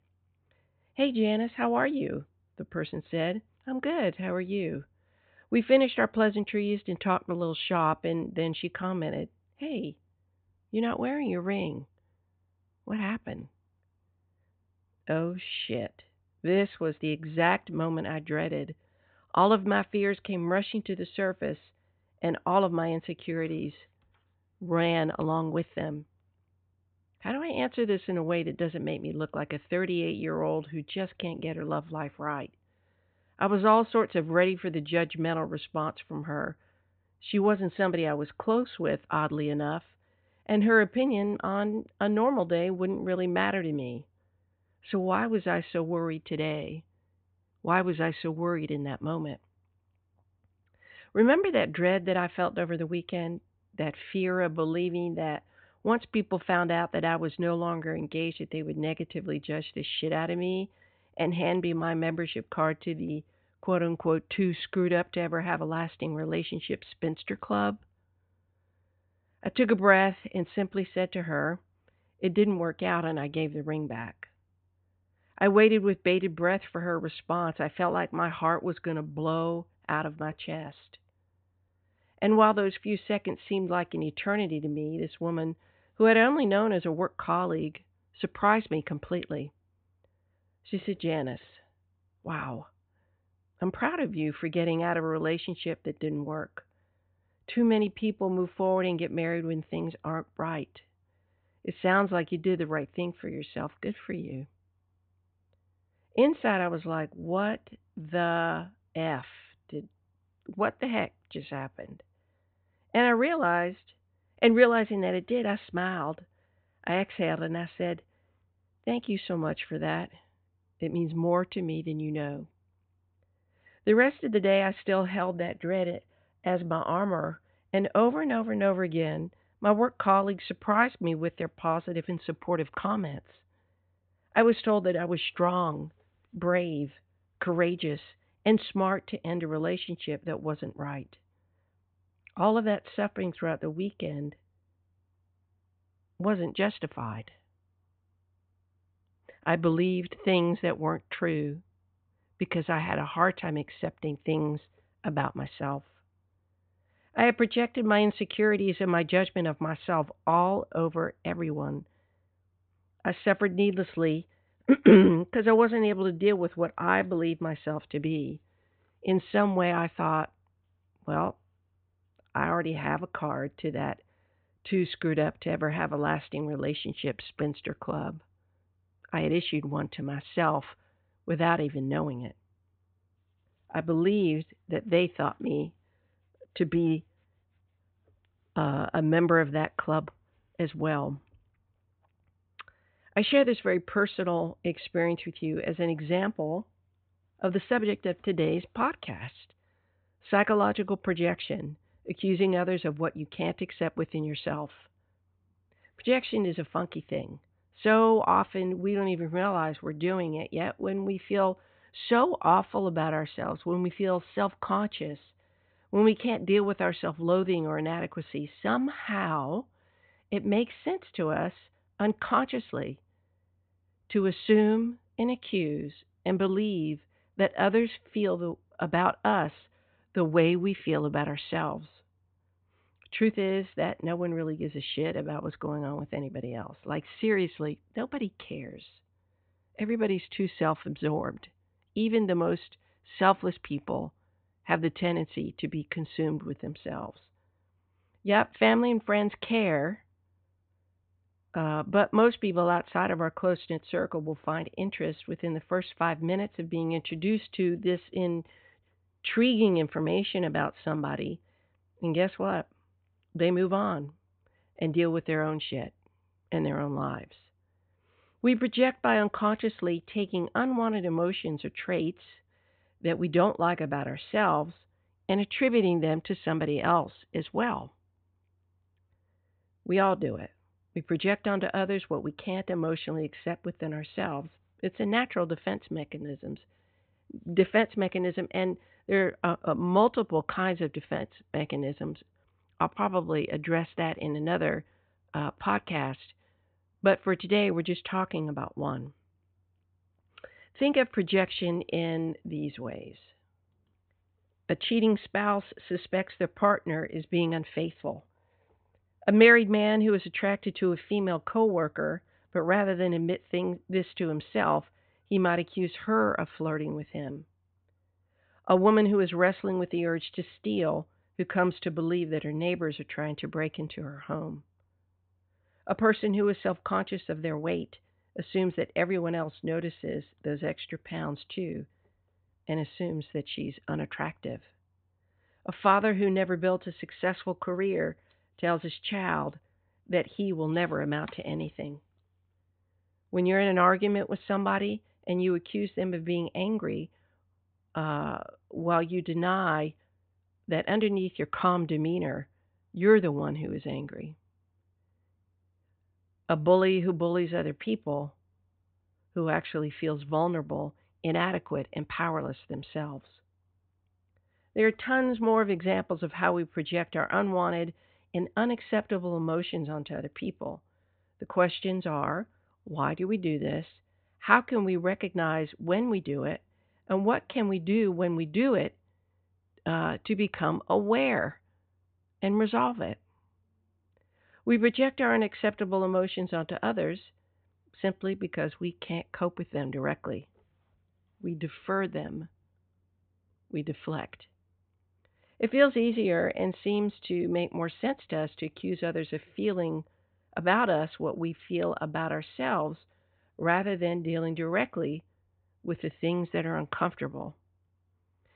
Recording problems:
high frequencies cut off; severe; nothing above 4 kHz

